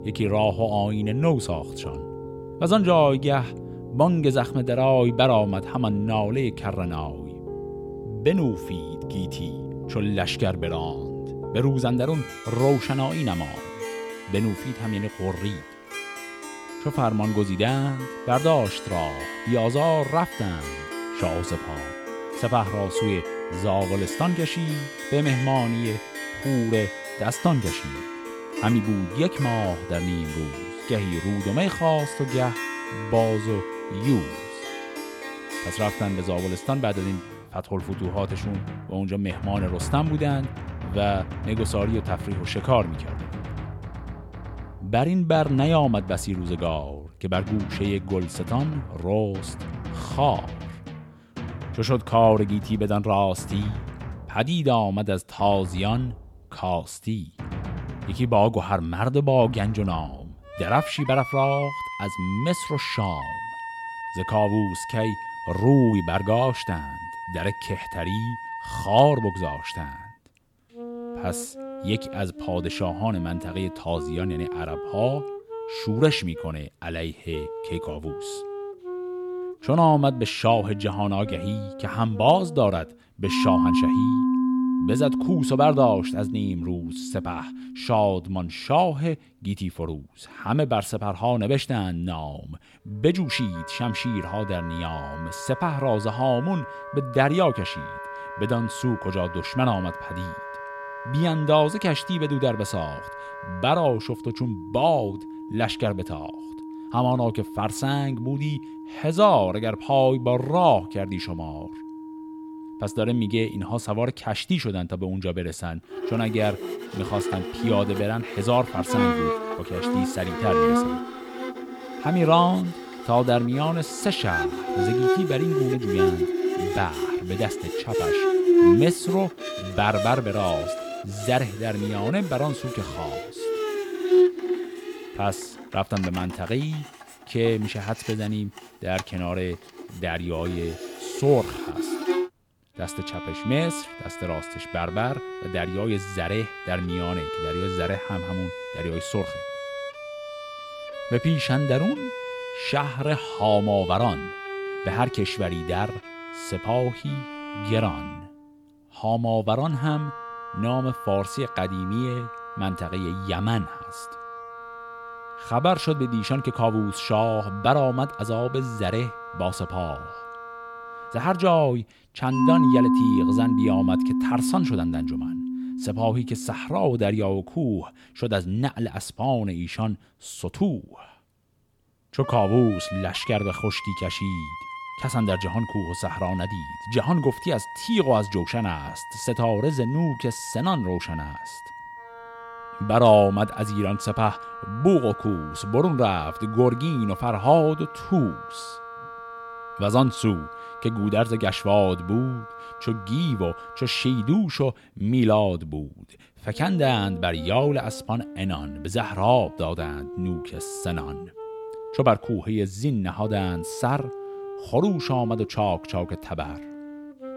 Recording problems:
background music; loud; throughout; 7 dB below the speech

